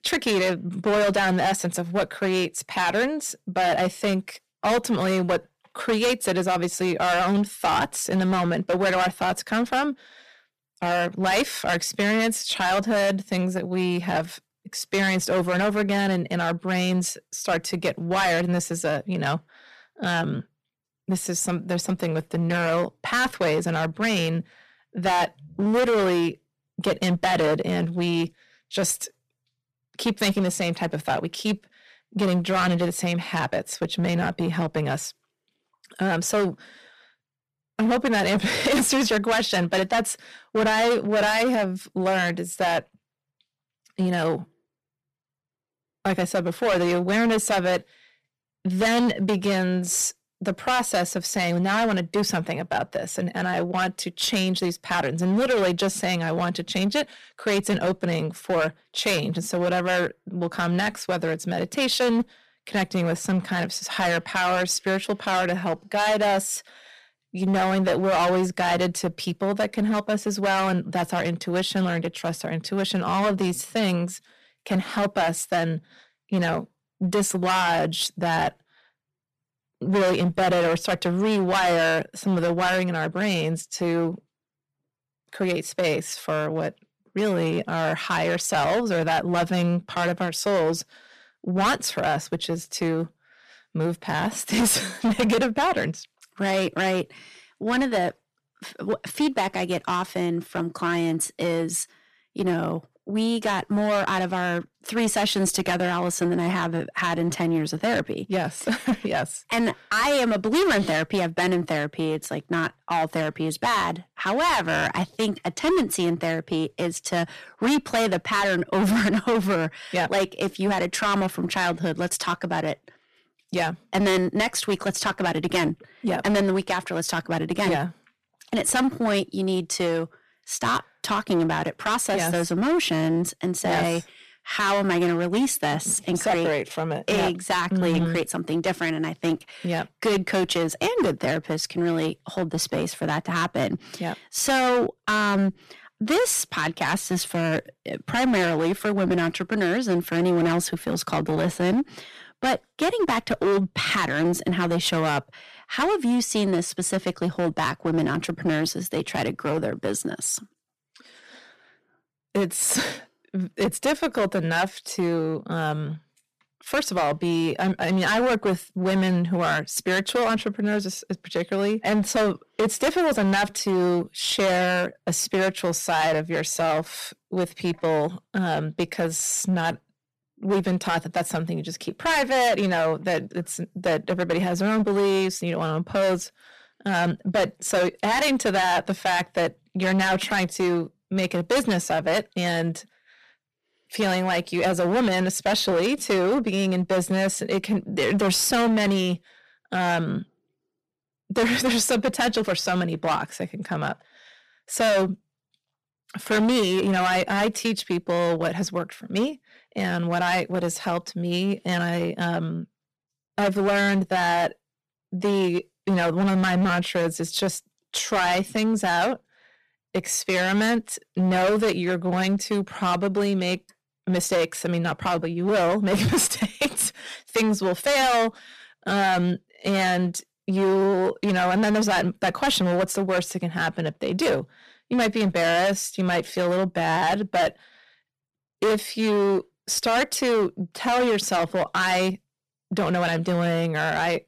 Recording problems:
distortion; heavy; 13% of the sound clipped

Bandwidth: 14.5 kHz